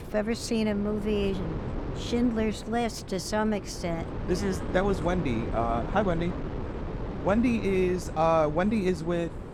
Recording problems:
wind noise on the microphone; occasional gusts; 10 dB below the speech

